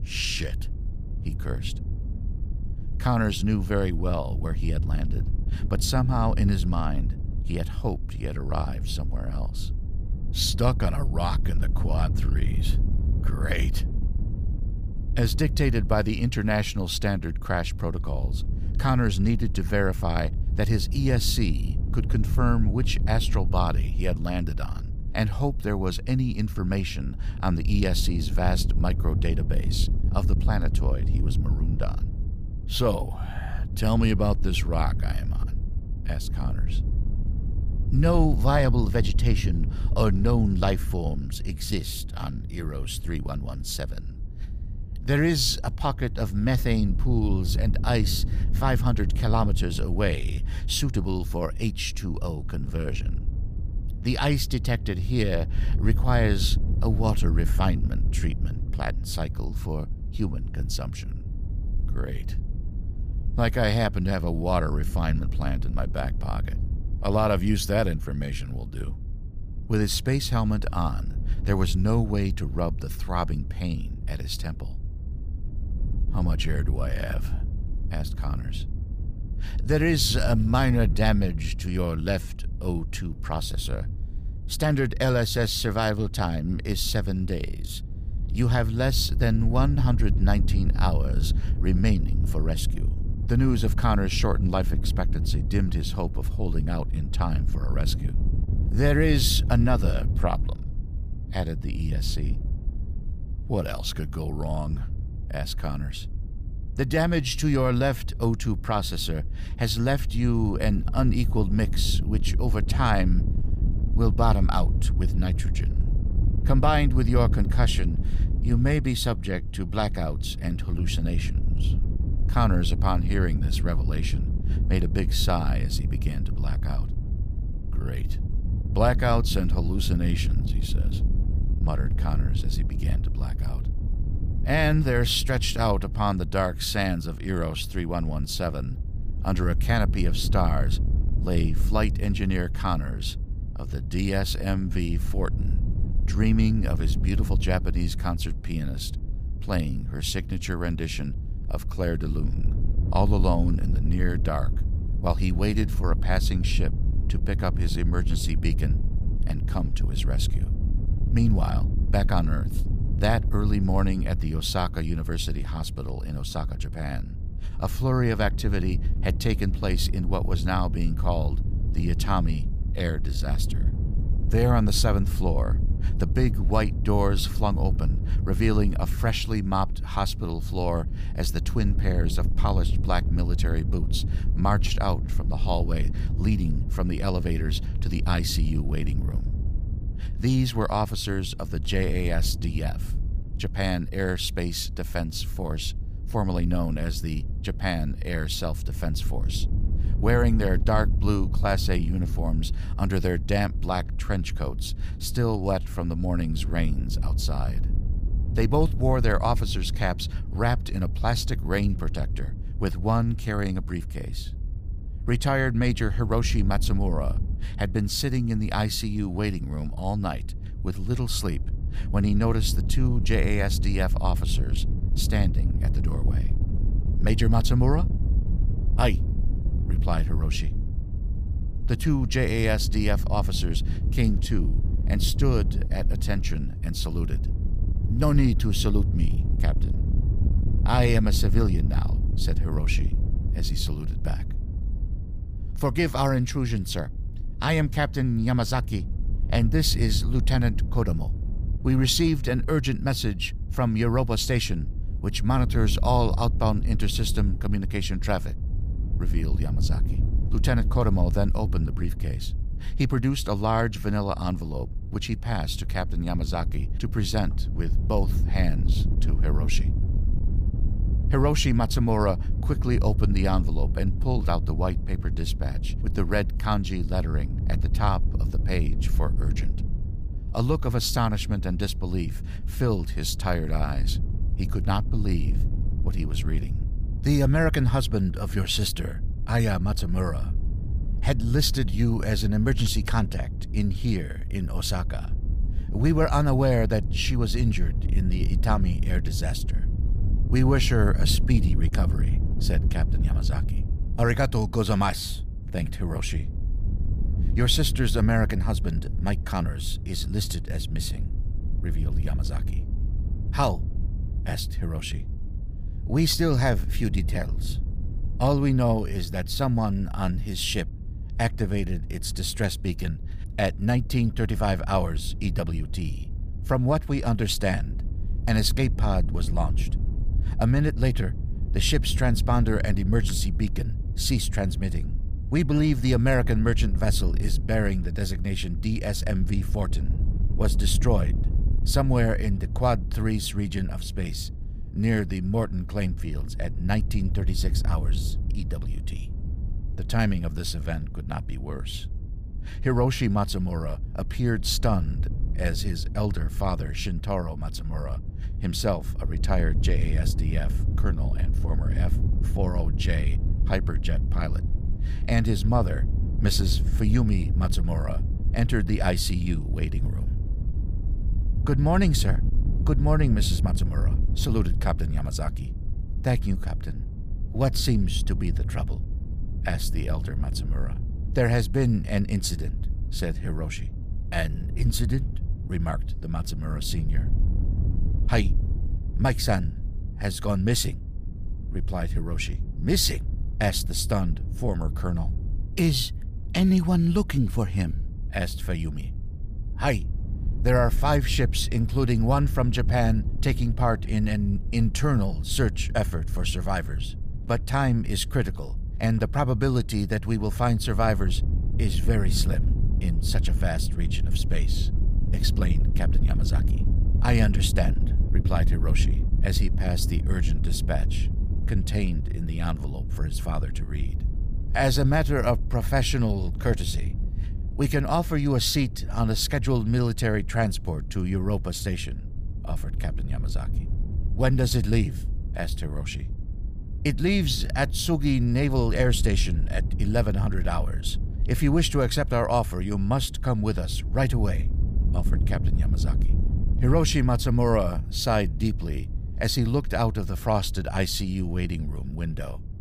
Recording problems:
wind noise on the microphone; occasional gusts; 15 dB below the speech

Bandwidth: 15 kHz